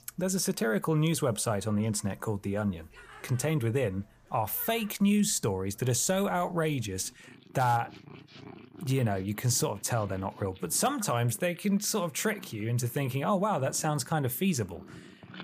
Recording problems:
animal sounds; faint; throughout; 25 dB below the speech

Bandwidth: 15 kHz